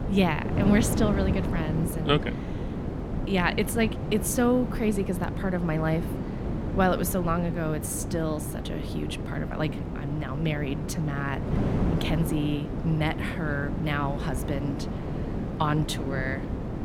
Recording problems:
wind noise on the microphone; heavy; 7 dB below the speech

